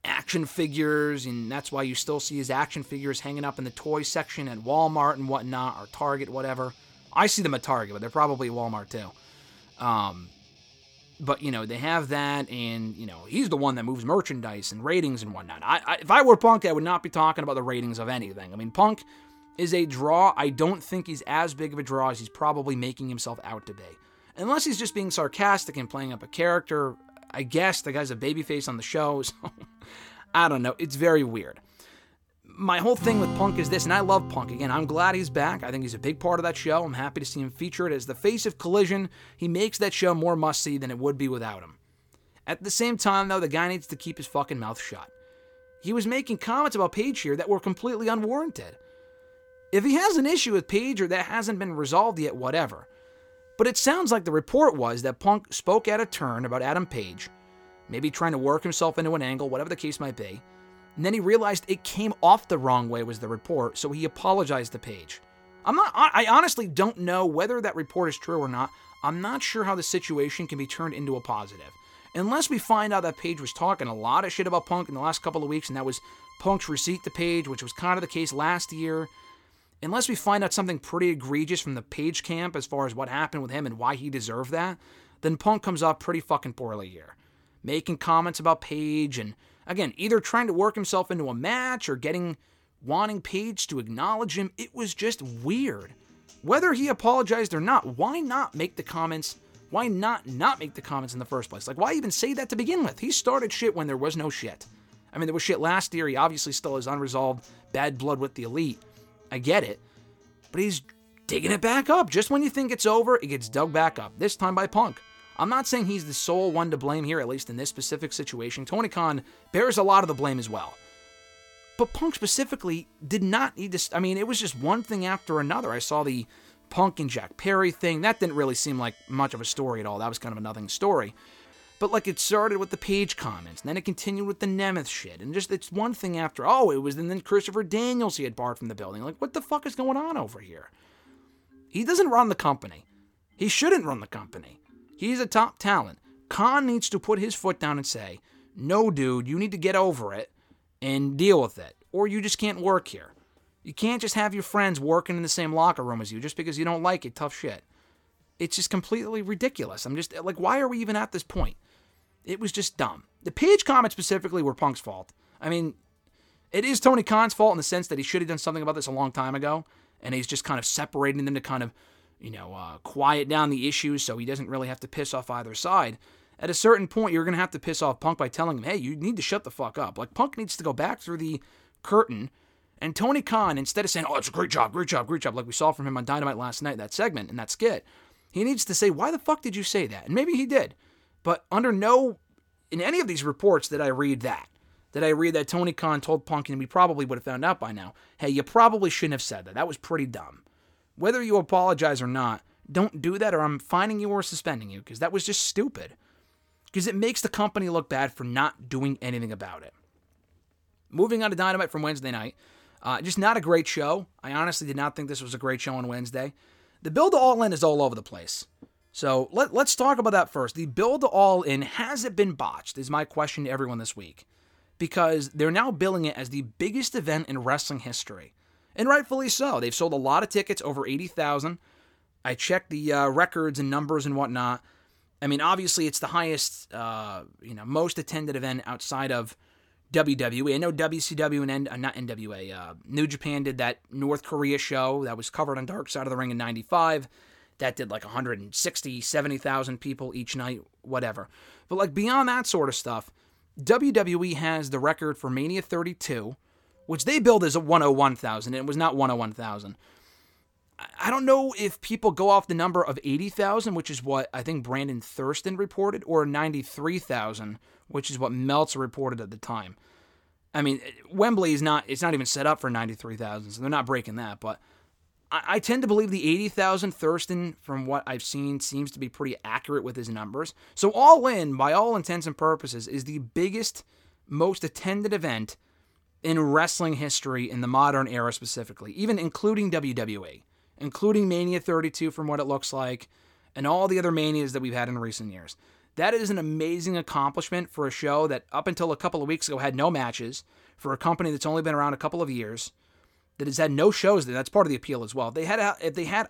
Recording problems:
background music; faint; throughout; 25 dB below the speech

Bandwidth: 18 kHz